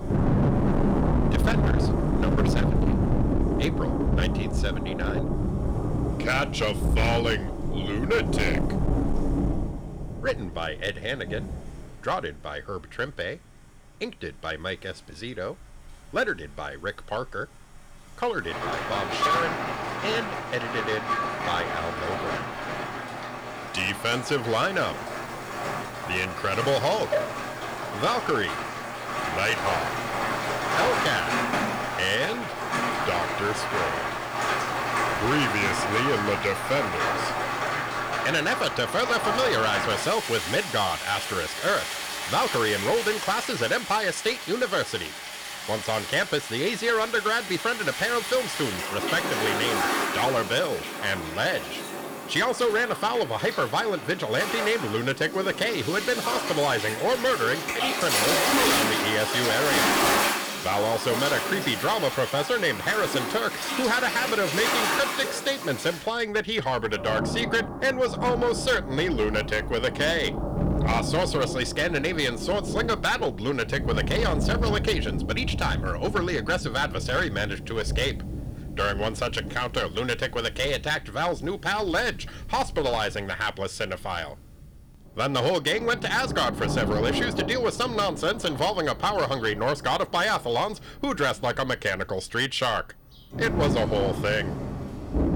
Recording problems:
distortion; slight; 8% of the sound clipped
rain or running water; loud; throughout; 2 dB below the speech

